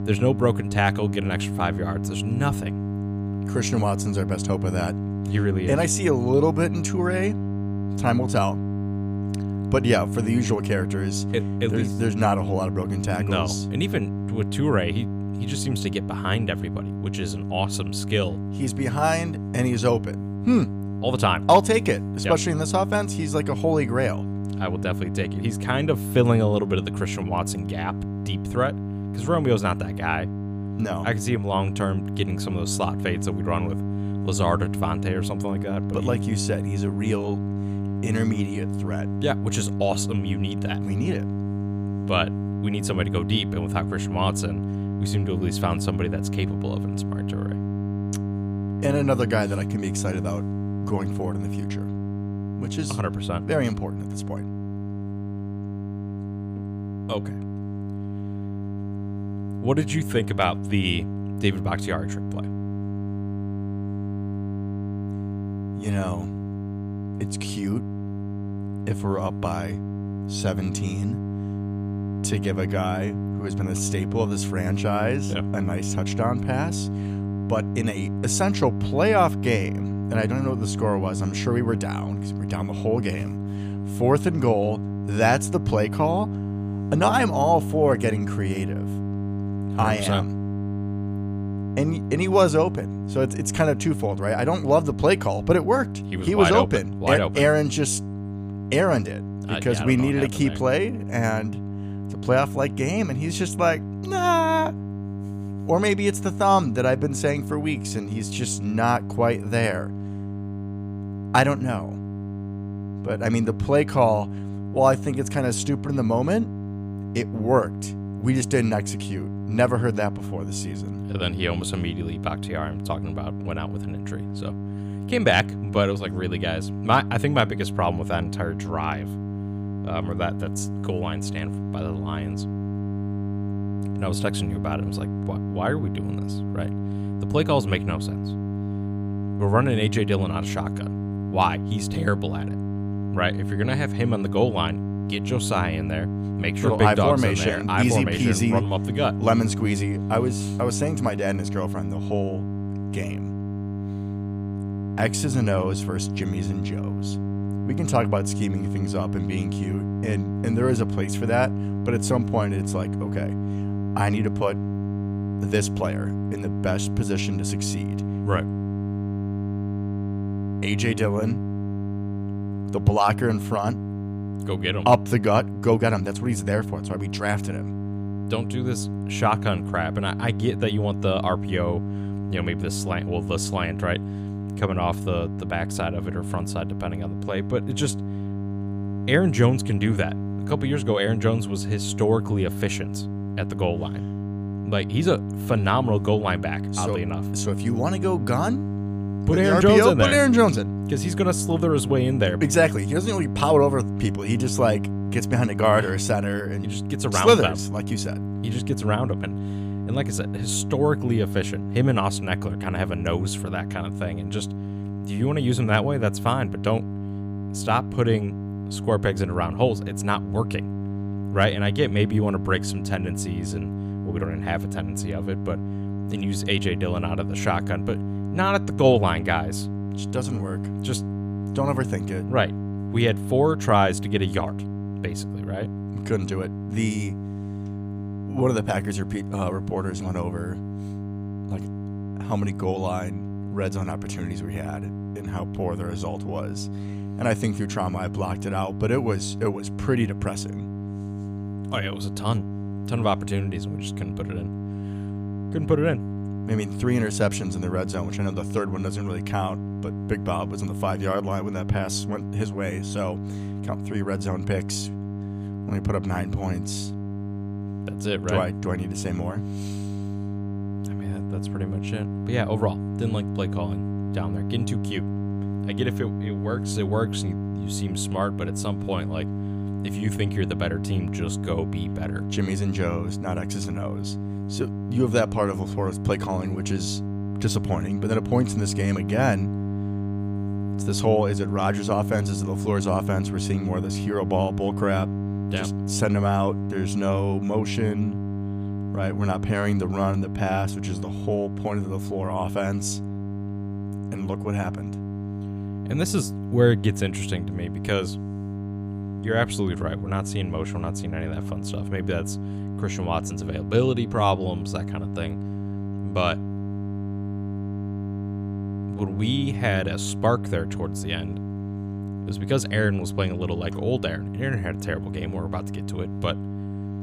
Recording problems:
electrical hum; noticeable; throughout; 50 Hz, 10 dB below the speech

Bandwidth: 15 kHz